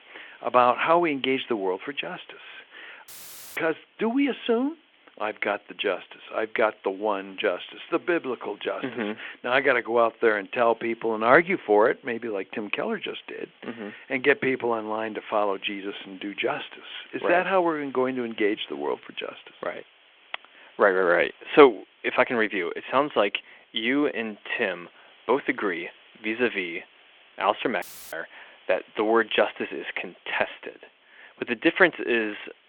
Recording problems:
muffled; very; fading above 3.5 kHz
phone-call audio
hiss; faint; throughout; 30 dB below the speech
audio cutting out; filled with static; at 3 s and at 28 s

